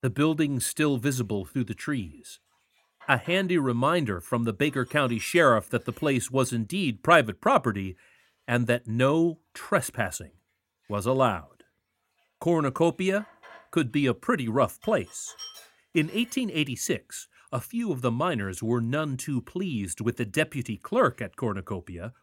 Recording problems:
household noises; faint; throughout; 25 dB below the speech

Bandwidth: 16.5 kHz